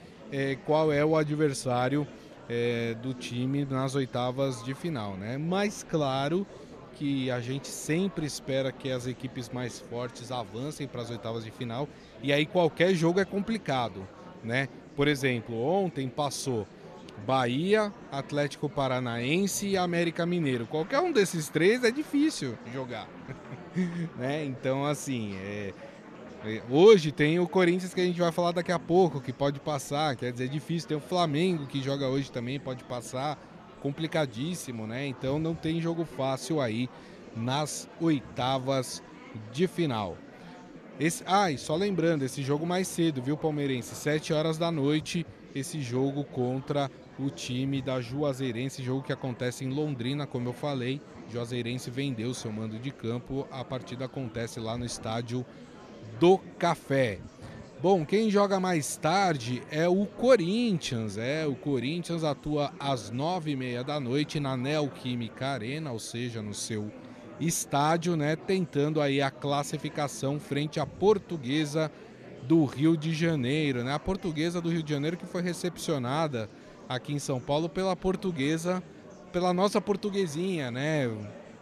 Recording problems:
murmuring crowd; noticeable; throughout; 20 dB below the speech

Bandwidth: 13.5 kHz